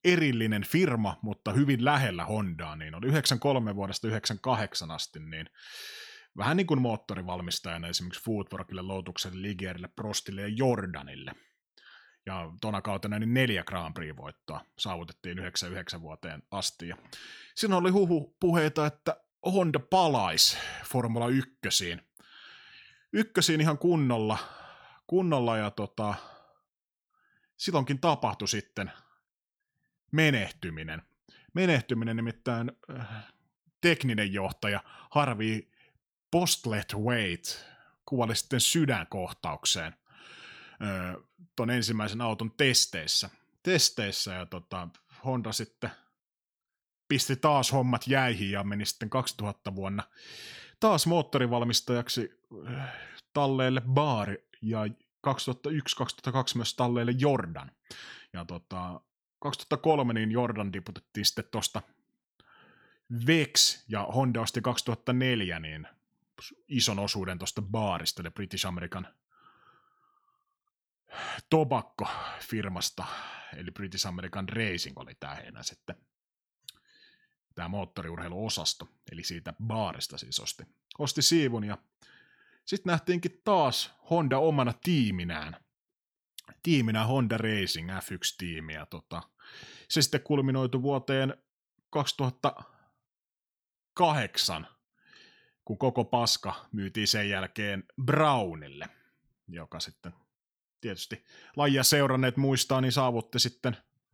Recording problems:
none

